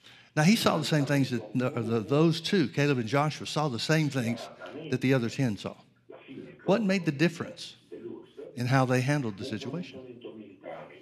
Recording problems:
voice in the background; noticeable; throughout; 15 dB below the speech

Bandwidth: 13.5 kHz